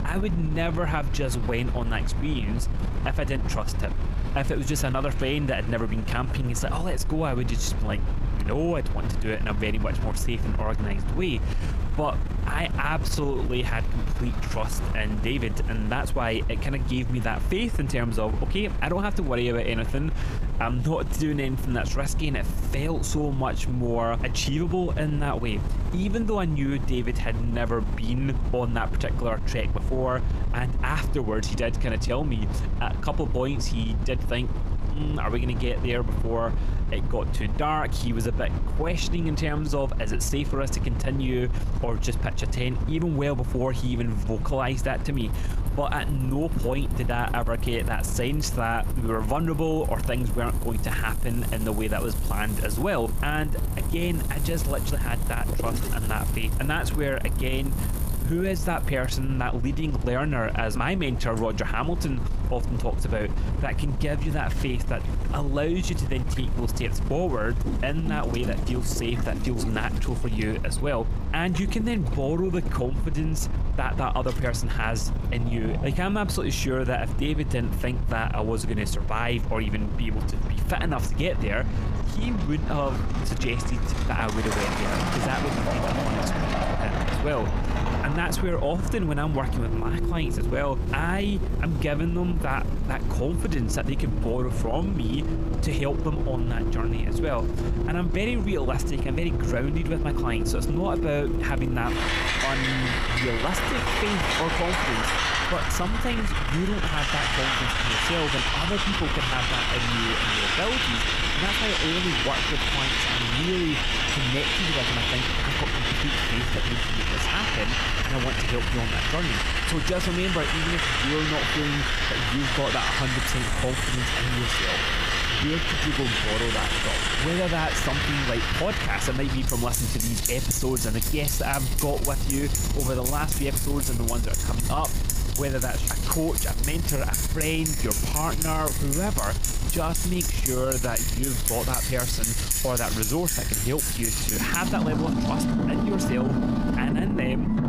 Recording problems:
squashed, flat; somewhat
traffic noise; very loud; throughout; 1 dB above the speech
rain or running water; noticeable; throughout; 15 dB below the speech
low rumble; noticeable; throughout; 10 dB below the speech

